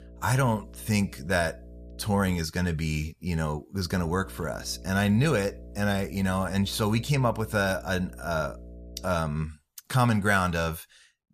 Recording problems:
electrical hum; faint; until 2.5 s and from 4 to 9 s; 60 Hz, 25 dB below the speech

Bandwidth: 14.5 kHz